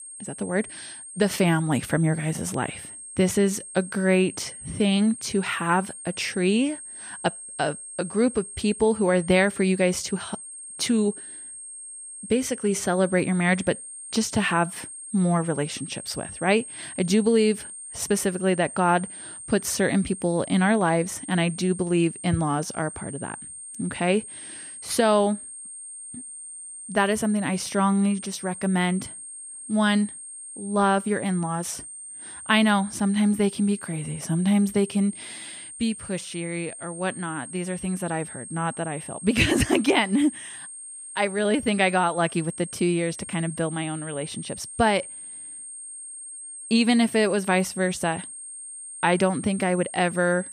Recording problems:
high-pitched whine; noticeable; throughout; 8.5 kHz, 10 dB below the speech

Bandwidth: 15 kHz